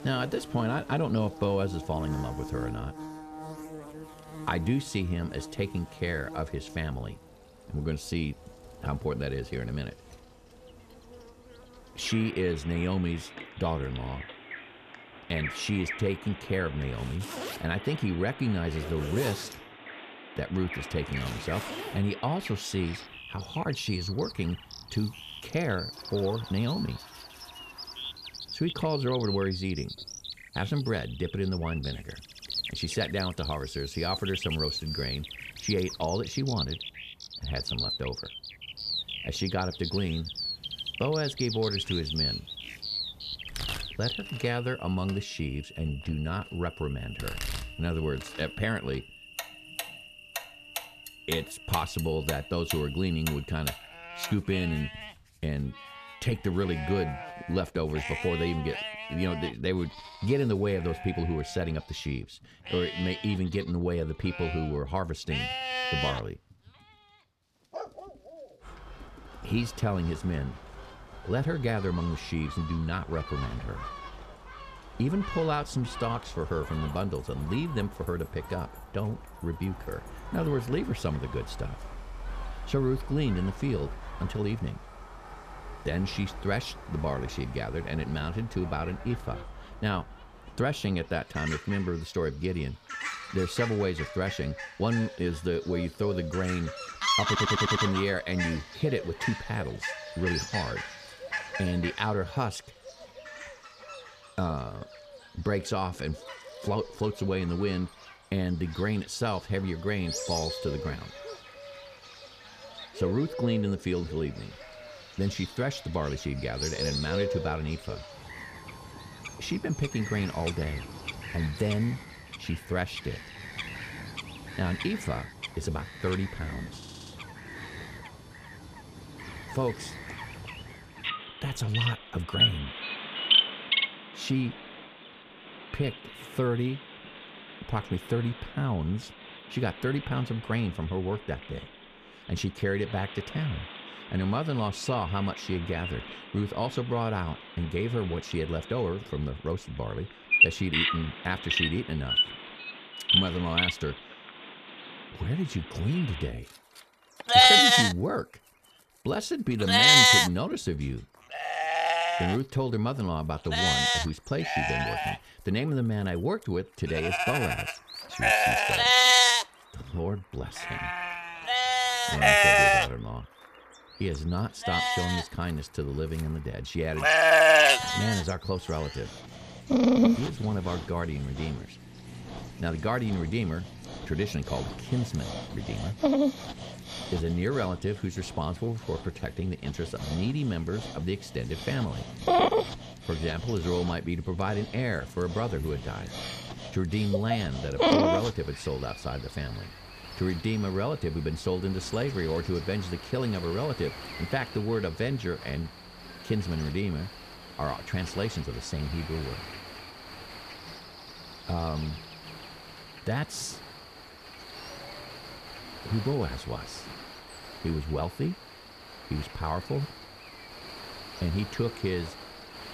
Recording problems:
animal sounds; very loud; throughout; 4 dB above the speech
household noises; noticeable; until 1:29; 10 dB below the speech
audio stuttering; at 1:37 and at 2:07

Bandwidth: 14.5 kHz